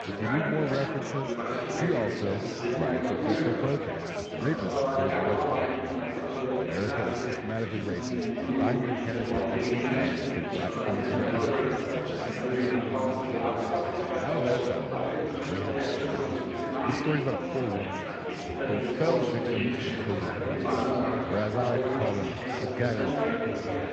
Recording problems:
echo of what is said; faint; throughout; 380 ms later, 20 dB below the speech
garbled, watery; slightly
chatter from many people; very loud; throughout; 4 dB above the speech

